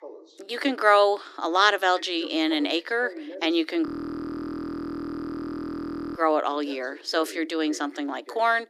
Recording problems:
thin; very slightly; fading below 300 Hz
voice in the background; noticeable; throughout; 20 dB below the speech
audio freezing; at 4 s for 2.5 s

